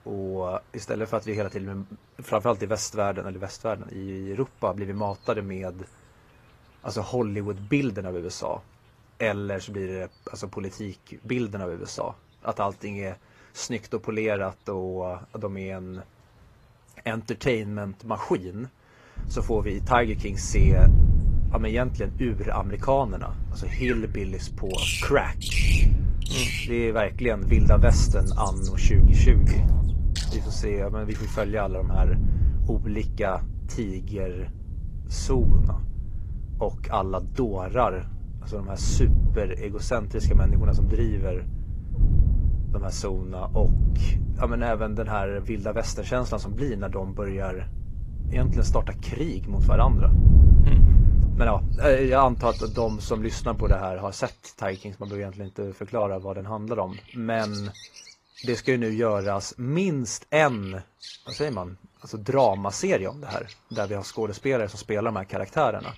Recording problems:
garbled, watery; slightly; nothing above 14.5 kHz
animal sounds; loud; throughout; 8 dB below the speech
wind noise on the microphone; occasional gusts; from 19 to 54 s; 15 dB below the speech

